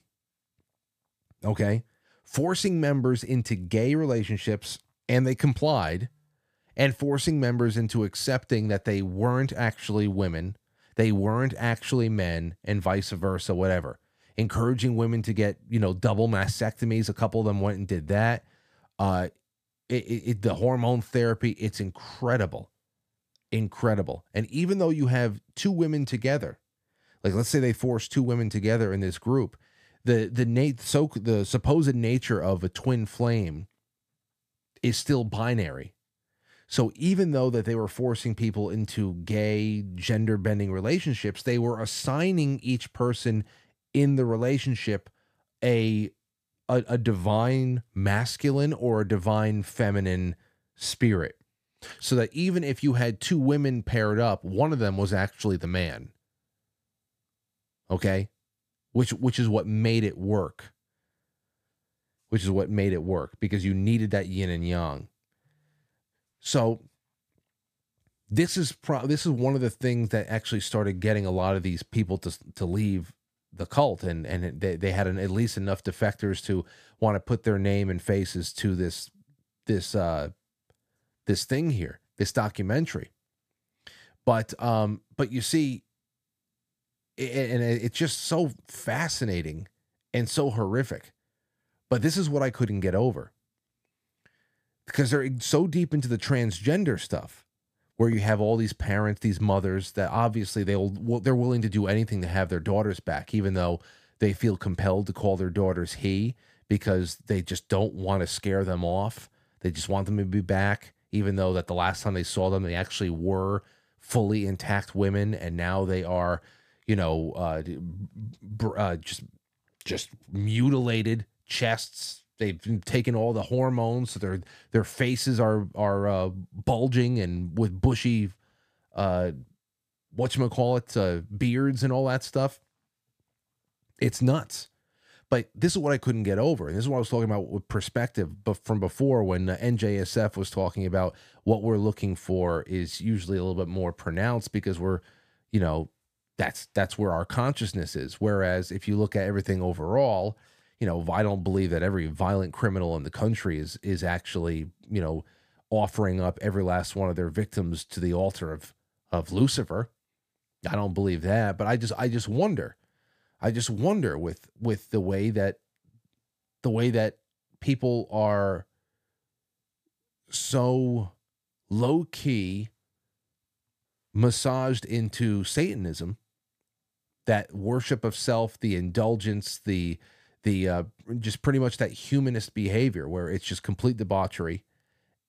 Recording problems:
none

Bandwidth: 15 kHz